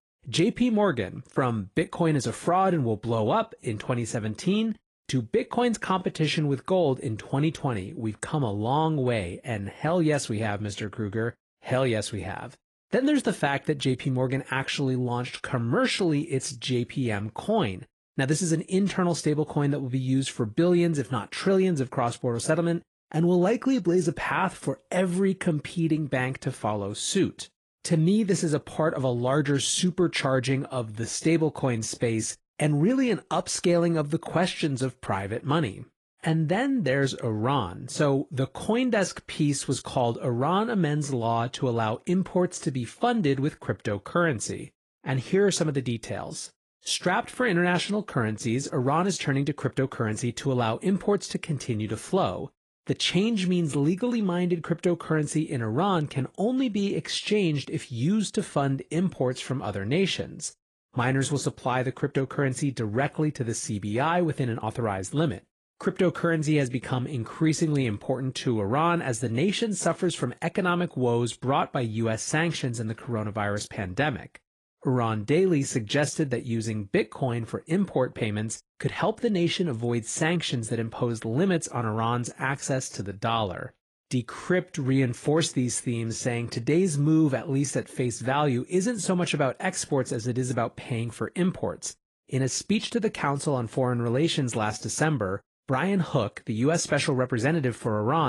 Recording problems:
garbled, watery; slightly
abrupt cut into speech; at the end

